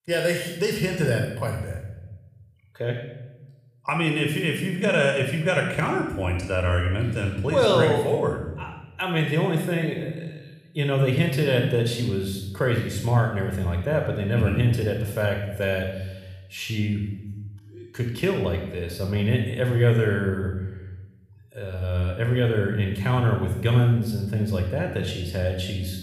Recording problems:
room echo; noticeable; dies away in 1 s
off-mic speech; somewhat distant

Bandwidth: 15 kHz